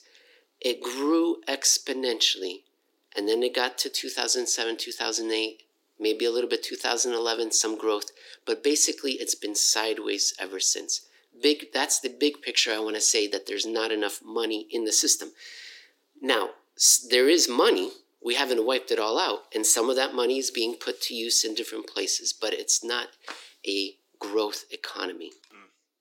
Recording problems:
thin; somewhat; fading below 300 Hz

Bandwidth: 16.5 kHz